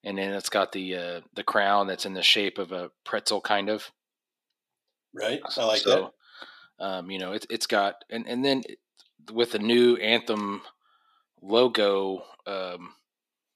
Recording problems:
thin; somewhat; fading below 300 Hz

